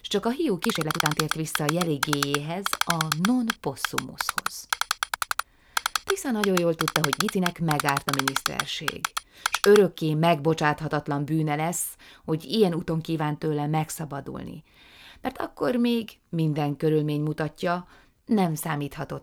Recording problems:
uneven, jittery; strongly; from 0.5 to 19 s
keyboard typing; loud; from 0.5 to 10 s; peak 2 dB above the speech

